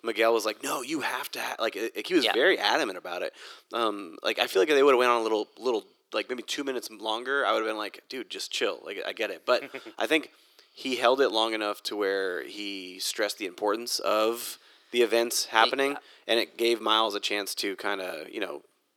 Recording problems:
thin; somewhat; fading below 350 Hz

